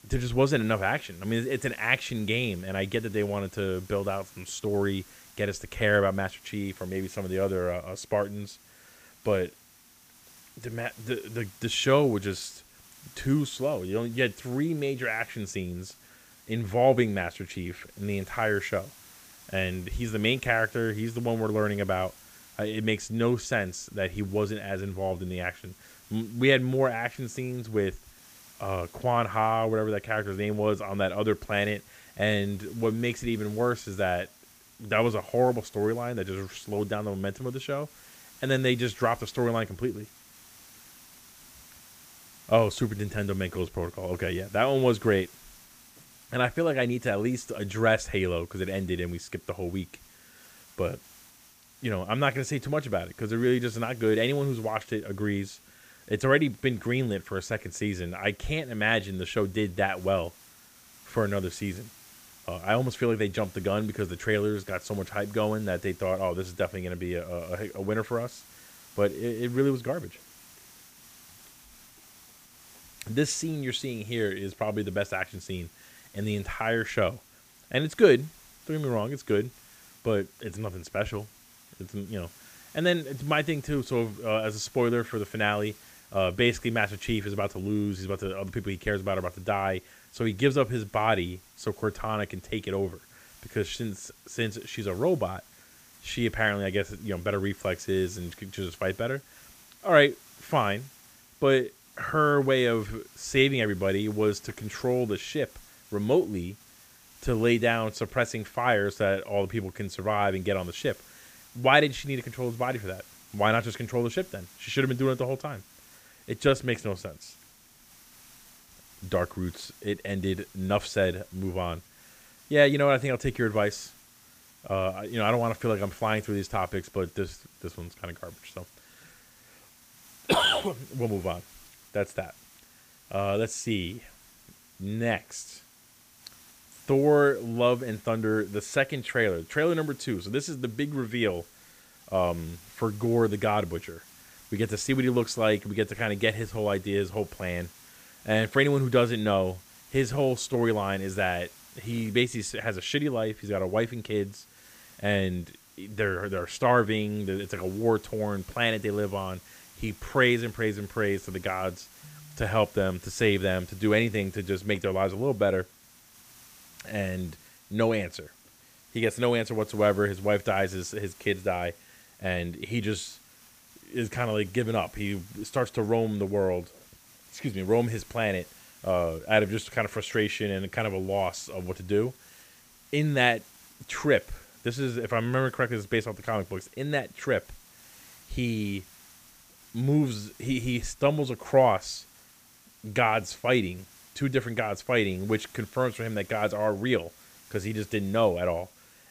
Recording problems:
hiss; faint; throughout; 25 dB below the speech

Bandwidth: 15 kHz